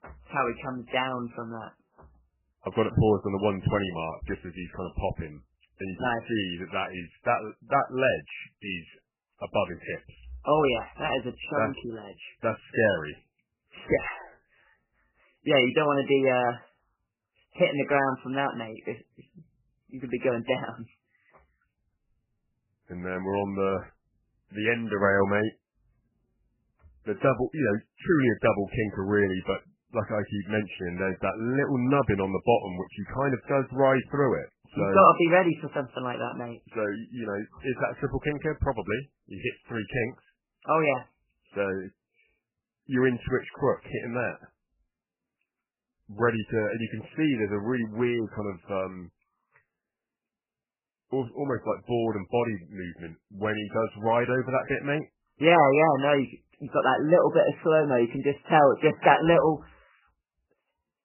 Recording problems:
garbled, watery; badly; nothing above 3 kHz

